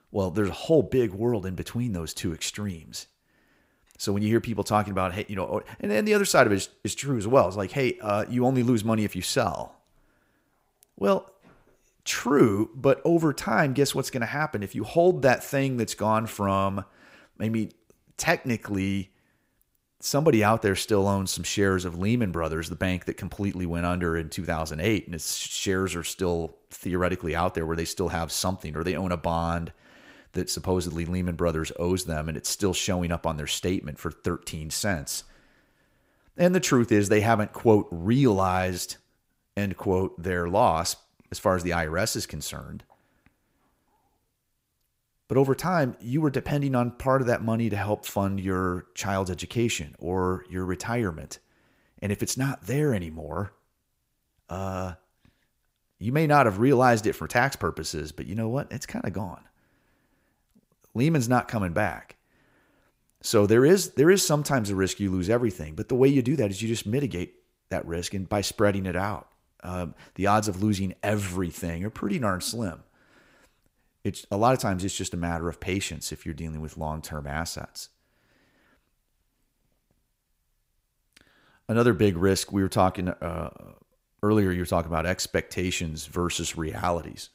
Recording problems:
none

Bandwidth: 15.5 kHz